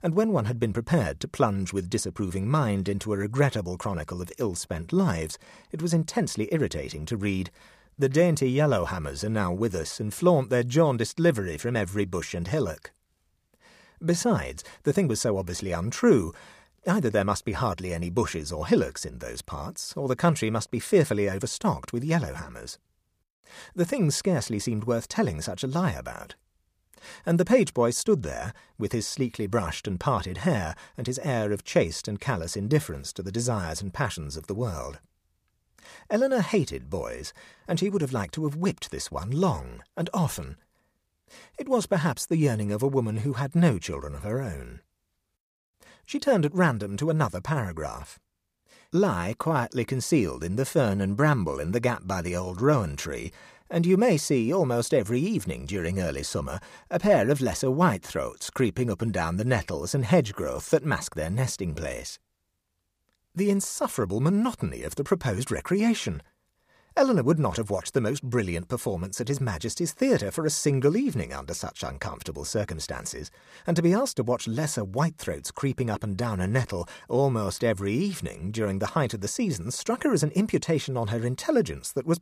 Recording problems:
none

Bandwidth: 15 kHz